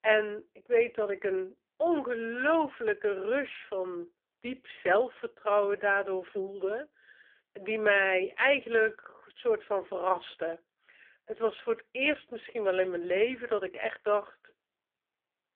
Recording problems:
phone-call audio; poor line

